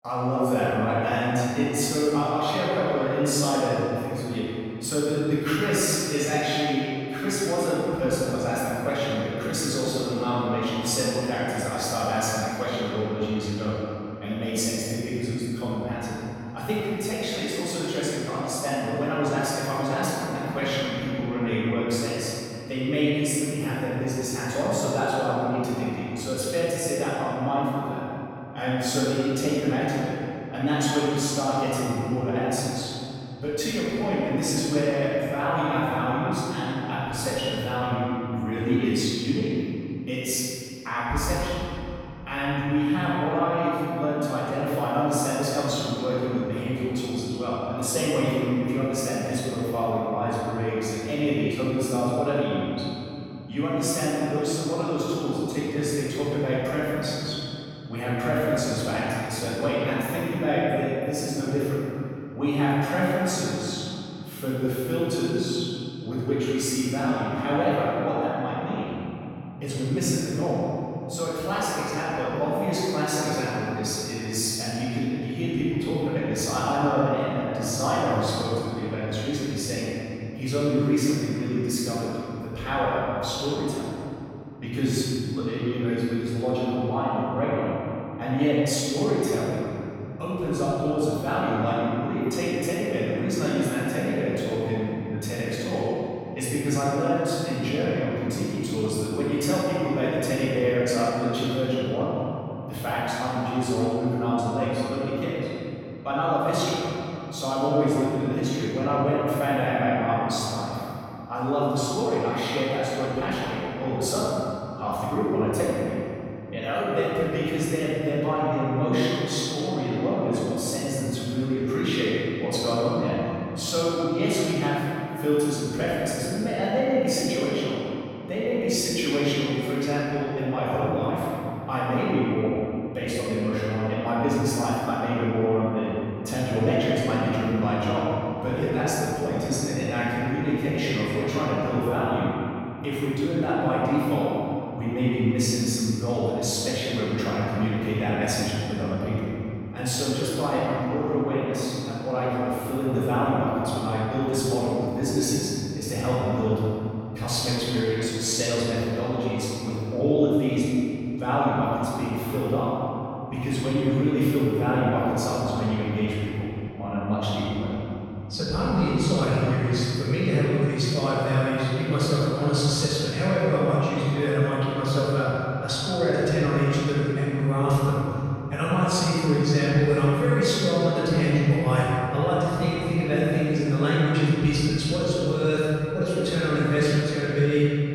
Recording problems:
room echo; strong; dies away in 2.9 s
off-mic speech; far

